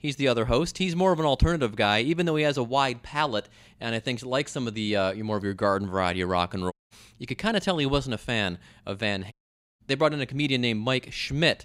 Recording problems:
audio cutting out; at 6.5 s and at 9.5 s

